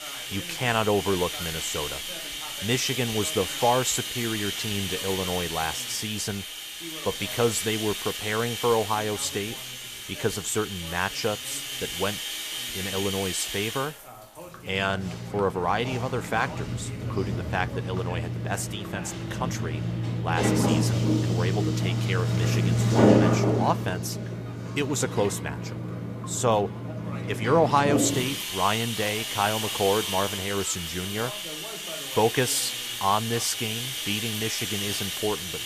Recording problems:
household noises; loud; throughout; 1 dB below the speech
voice in the background; noticeable; throughout; 20 dB below the speech
animal sounds; faint; throughout; 25 dB below the speech
rain or running water; faint; throughout; 25 dB below the speech

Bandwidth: 14.5 kHz